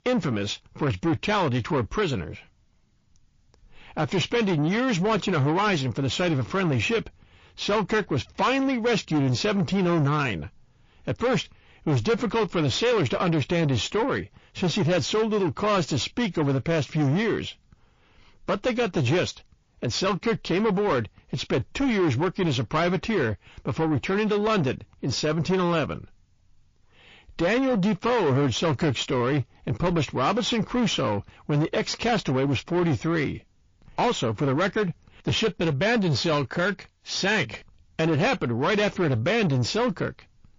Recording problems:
distortion; heavy; 7 dB below the speech
garbled, watery; slightly

